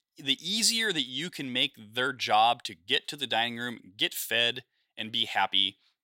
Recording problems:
thin; somewhat; fading below 600 Hz

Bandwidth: 16 kHz